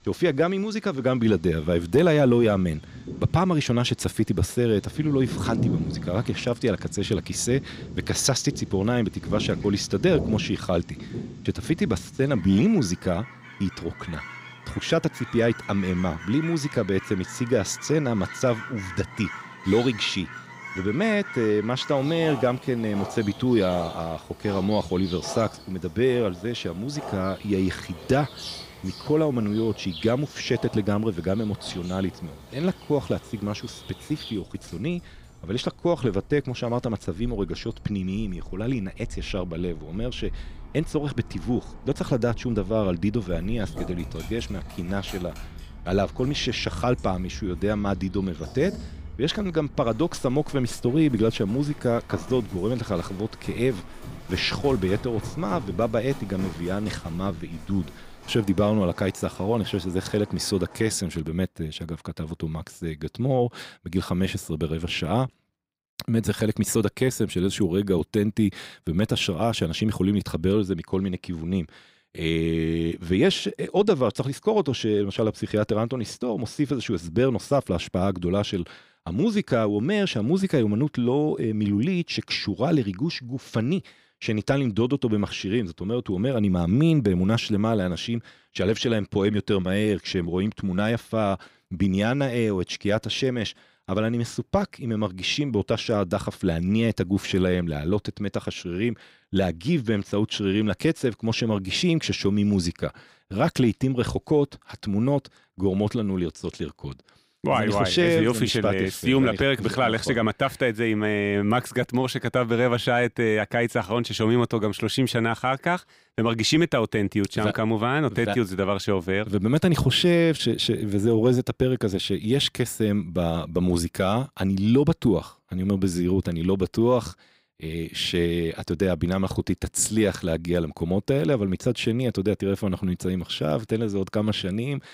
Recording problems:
animal sounds; noticeable; until 1:01; 15 dB below the speech

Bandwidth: 15.5 kHz